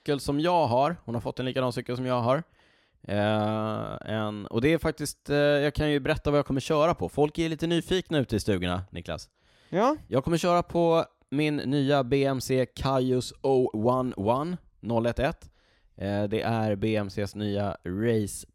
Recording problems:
none

